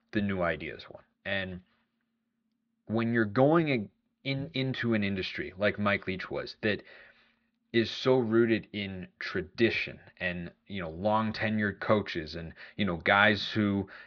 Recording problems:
muffled; slightly; fading above 4 kHz

